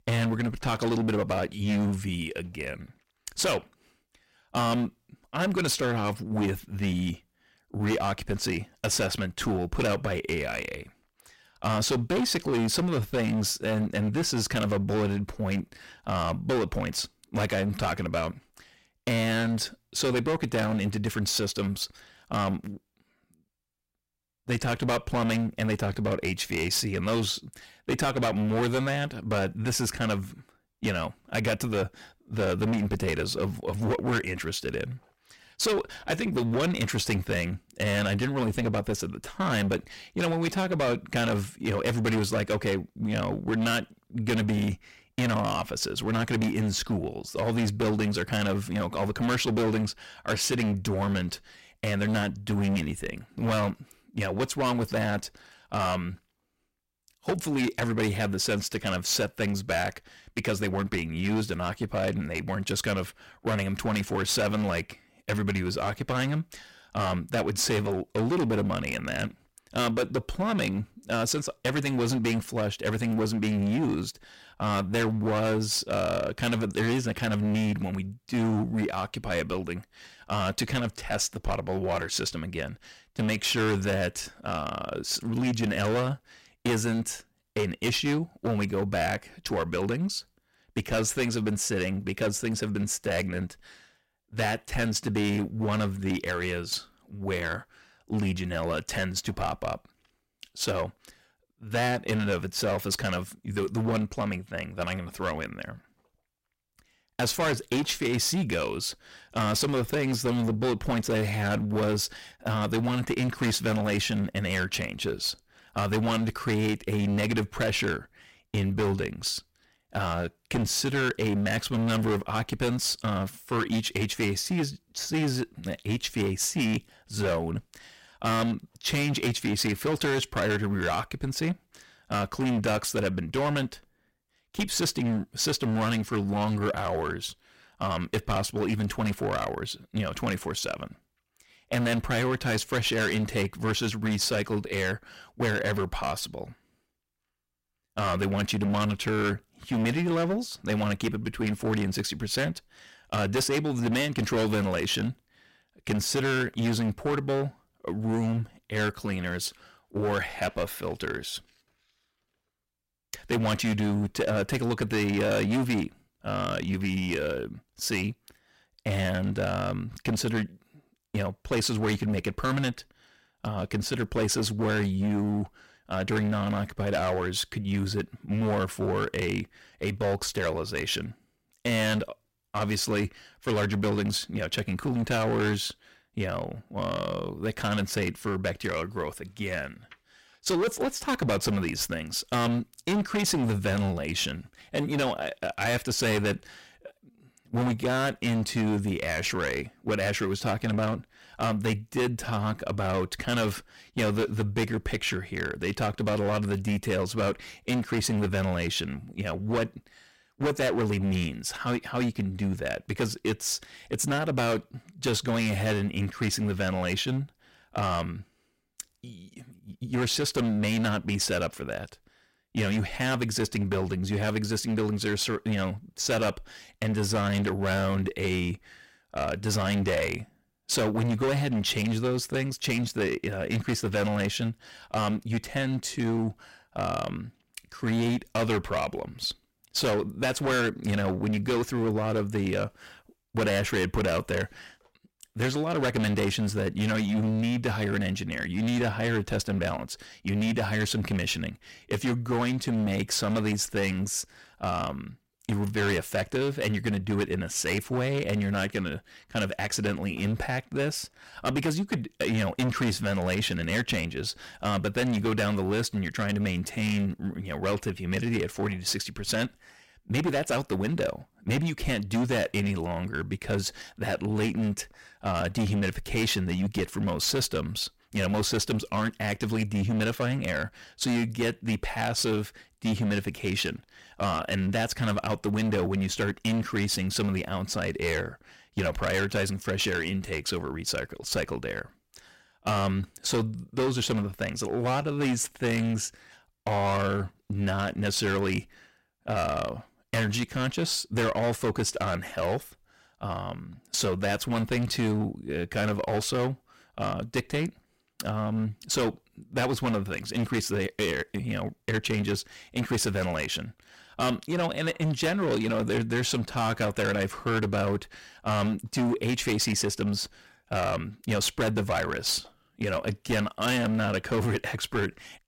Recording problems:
distortion; heavy; 14% of the sound clipped

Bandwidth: 16 kHz